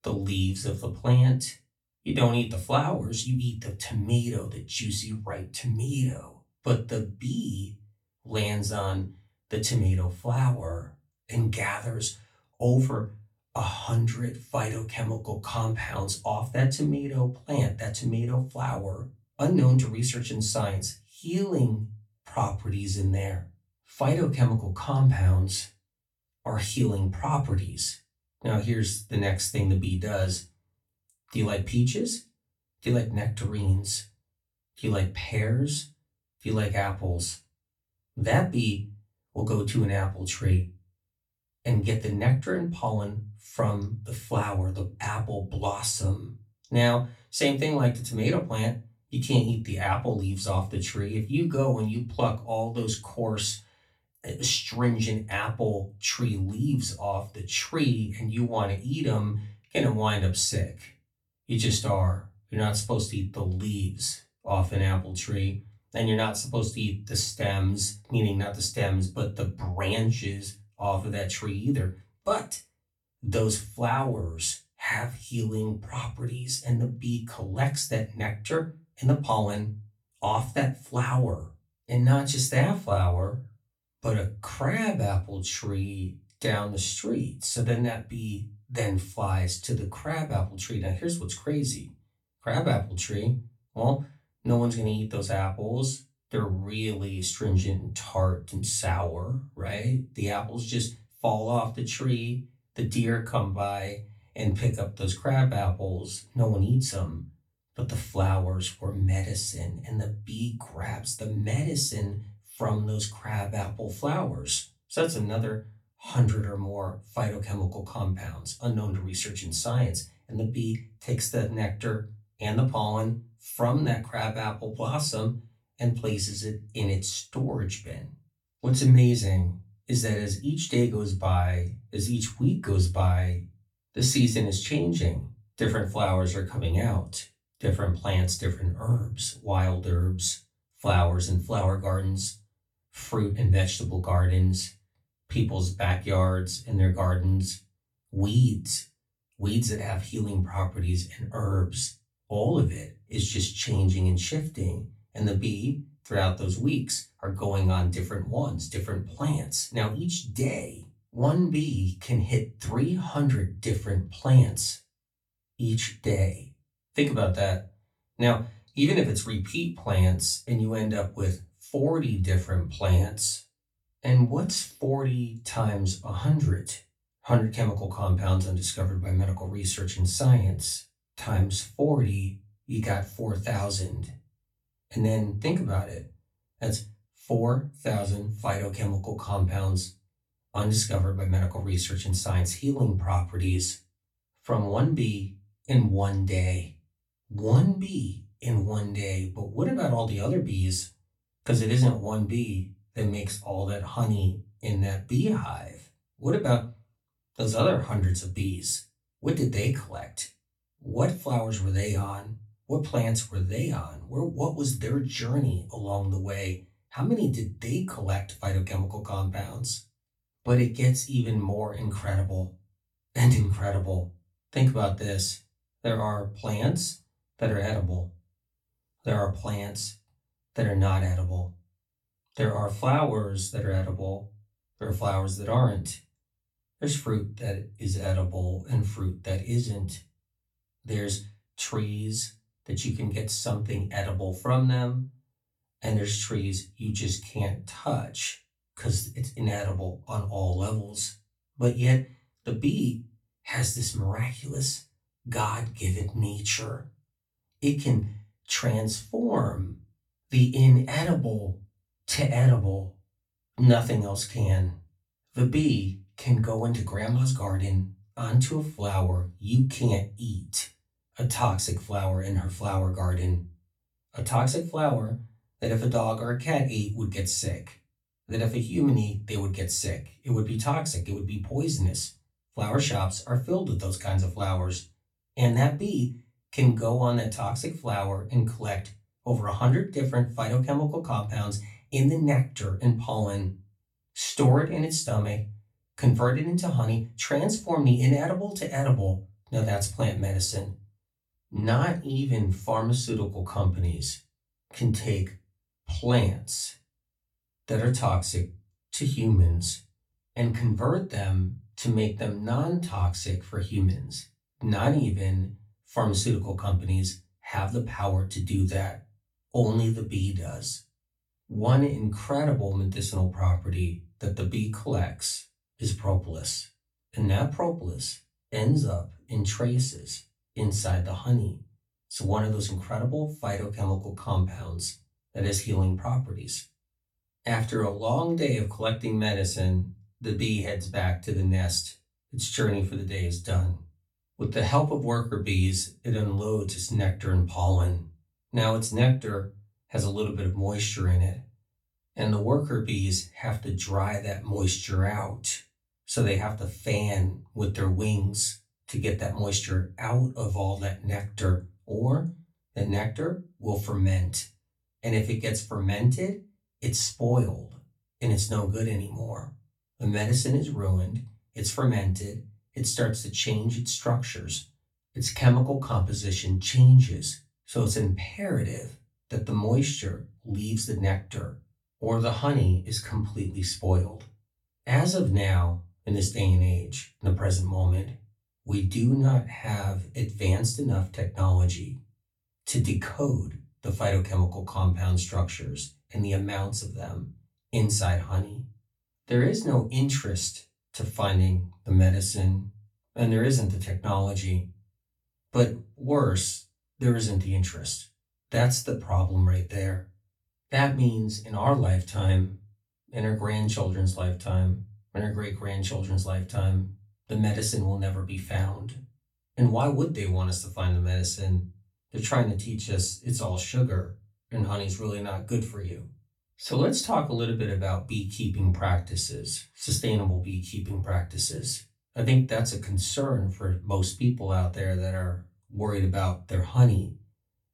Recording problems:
off-mic speech; far
room echo; very slight; dies away in 0.2 s

